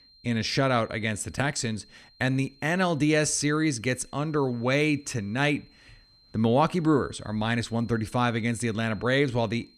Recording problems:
high-pitched whine; faint; throughout; 4 kHz, 30 dB below the speech

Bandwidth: 14.5 kHz